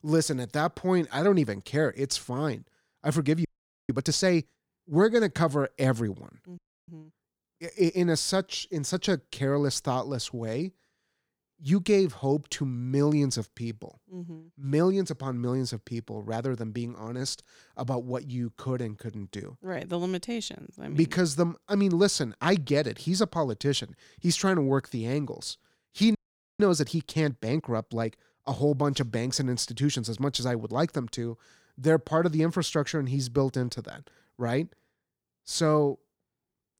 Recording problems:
audio freezing; at 3.5 s, at 6.5 s and at 26 s

